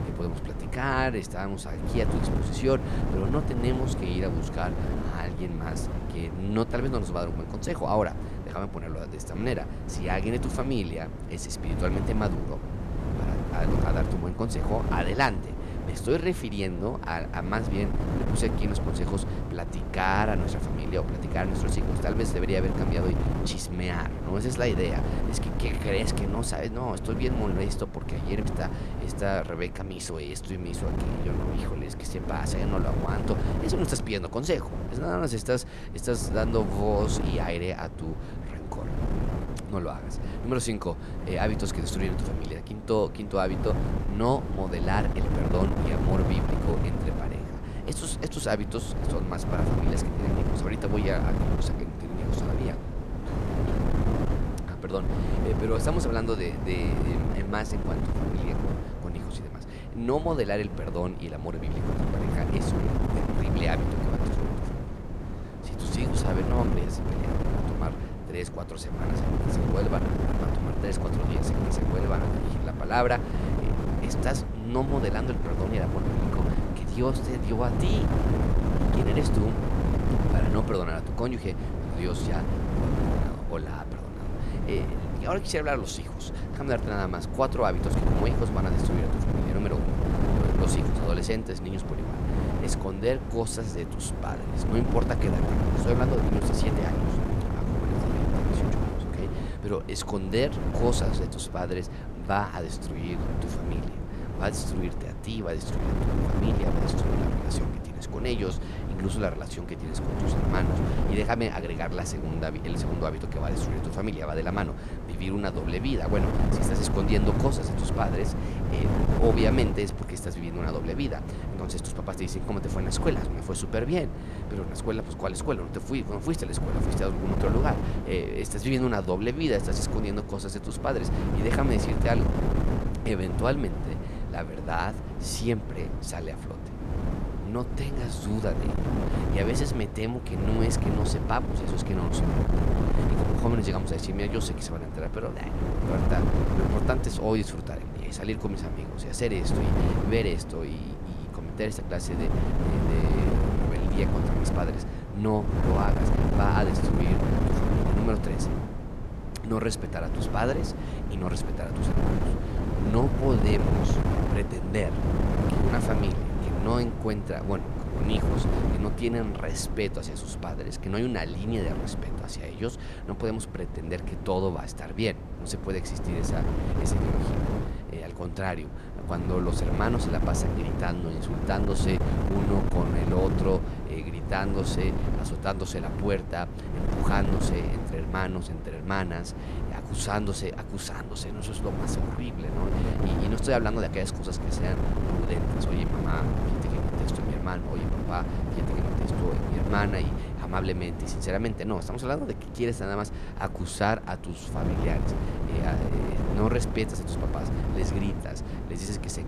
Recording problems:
wind noise on the microphone; heavy; 4 dB below the speech

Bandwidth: 14.5 kHz